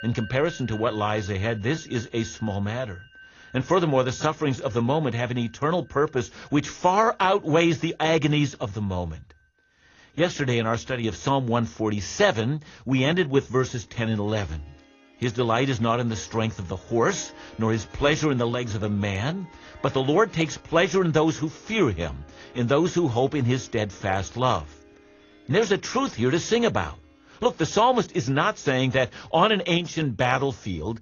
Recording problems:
garbled, watery; slightly; nothing above 6.5 kHz
background music; faint; throughout; 25 dB below the speech

